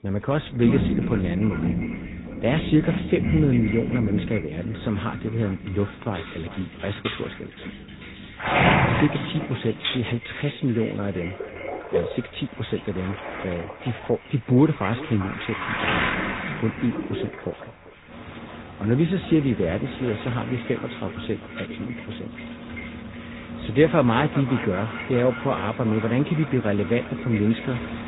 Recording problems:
high frequencies cut off; severe; nothing above 4 kHz
echo of what is said; noticeable; throughout; 390 ms later, 15 dB below the speech
garbled, watery; slightly
rain or running water; loud; throughout; 5 dB below the speech
keyboard typing; noticeable; from 6.5 to 10 s; peak 4 dB below the speech

